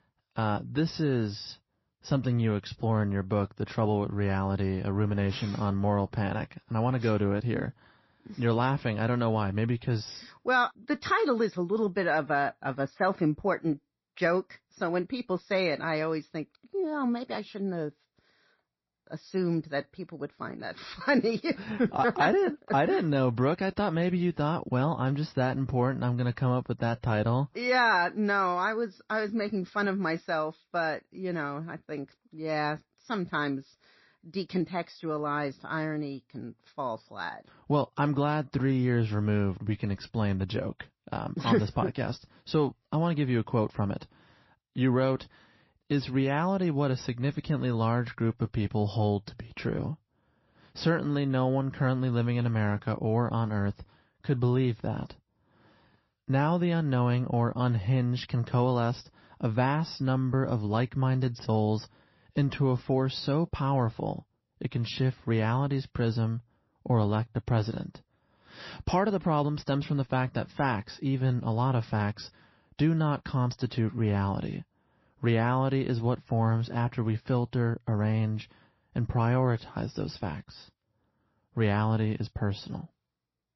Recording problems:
garbled, watery; slightly; nothing above 5.5 kHz

